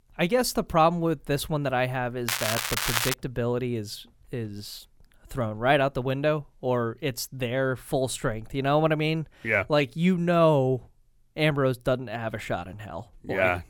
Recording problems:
crackling; loud; at 2.5 s; 1 dB below the speech

